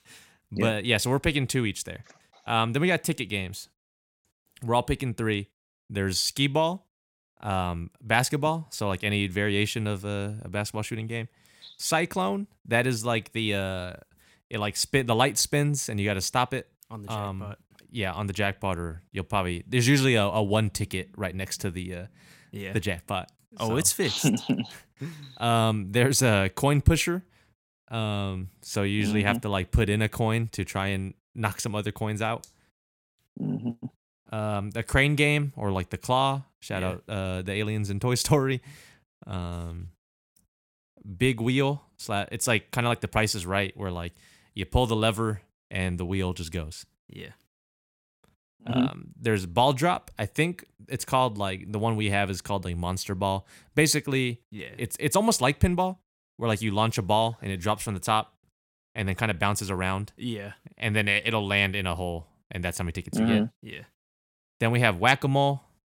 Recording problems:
none

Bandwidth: 16.5 kHz